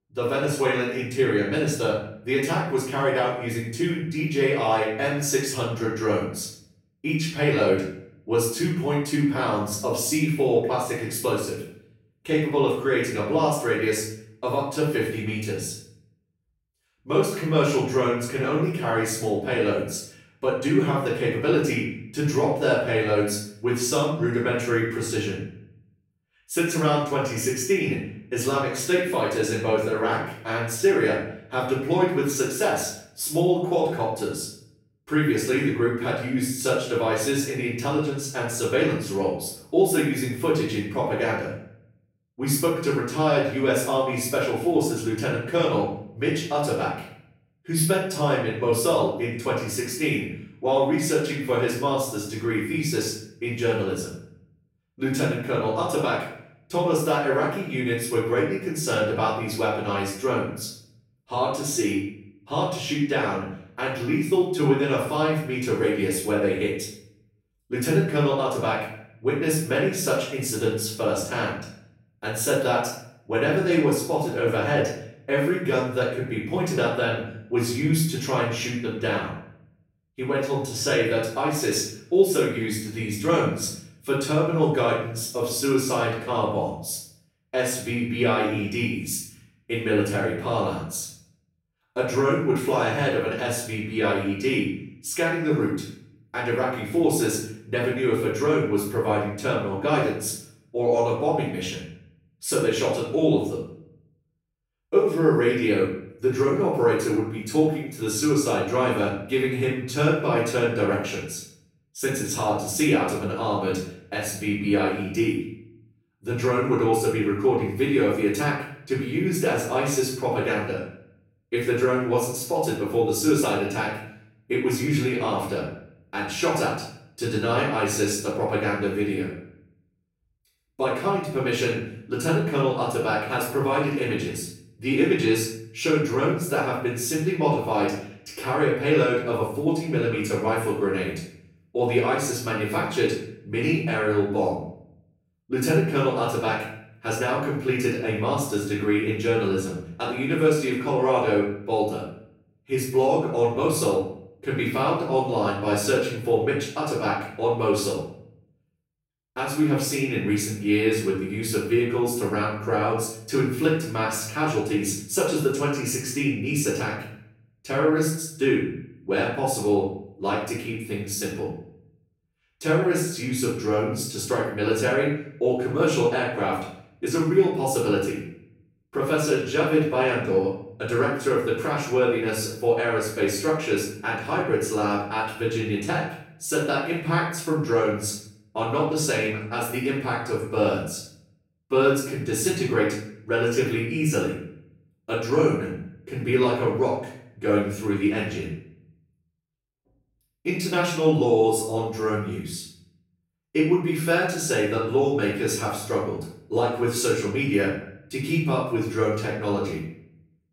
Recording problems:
off-mic speech; far
room echo; noticeable; dies away in 0.5 s

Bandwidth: 16 kHz